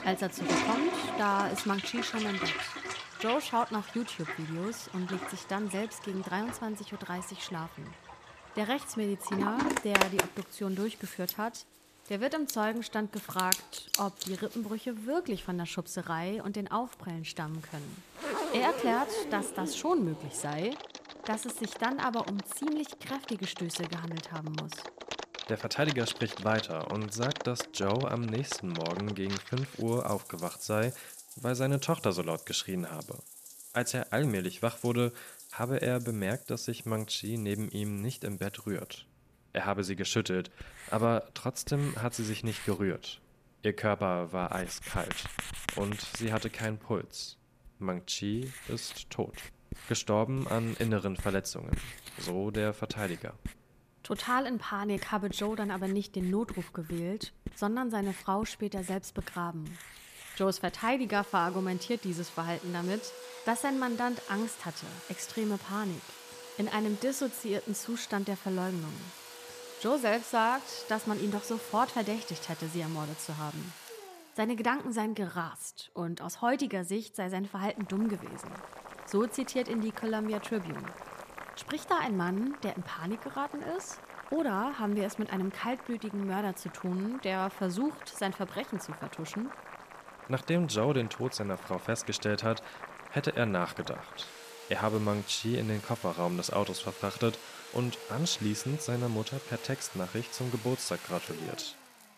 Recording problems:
household noises; loud; throughout; 8 dB below the speech

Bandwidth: 14.5 kHz